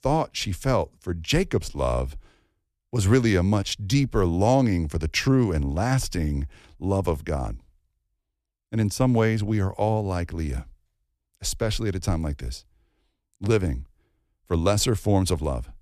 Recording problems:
none

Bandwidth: 14.5 kHz